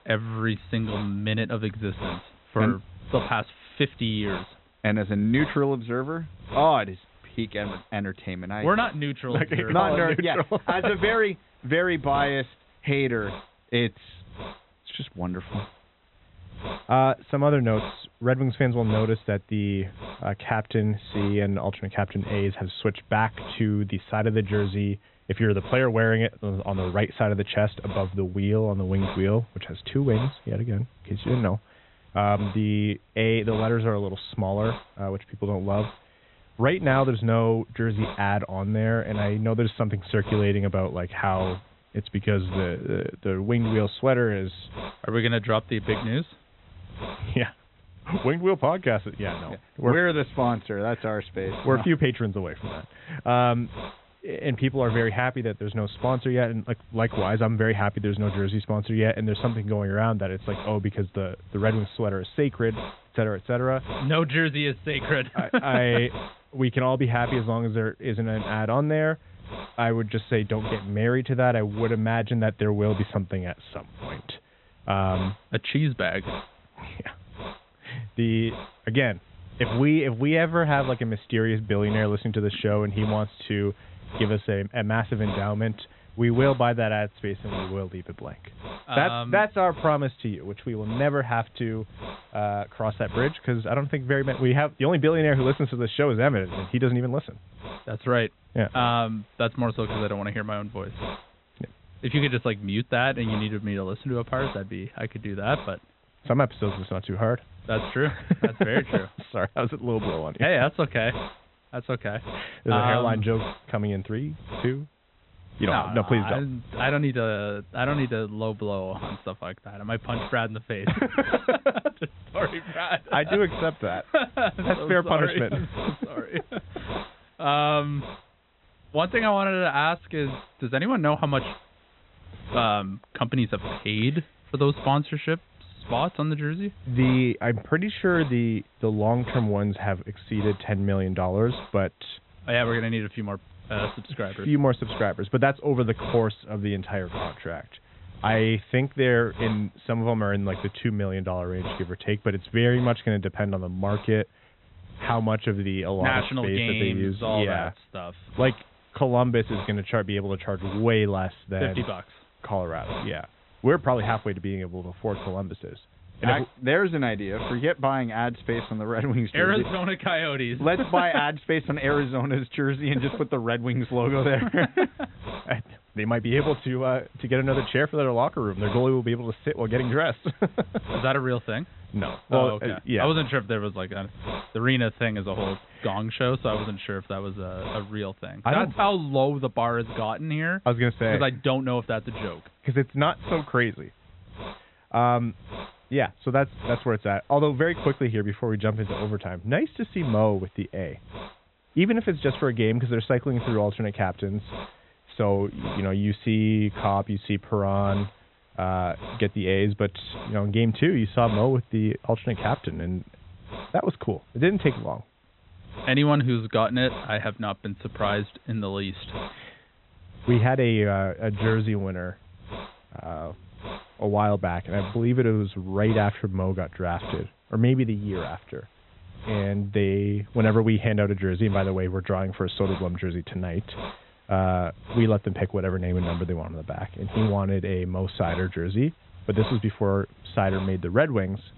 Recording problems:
high frequencies cut off; severe; nothing above 4 kHz
hiss; noticeable; throughout; 15 dB below the speech

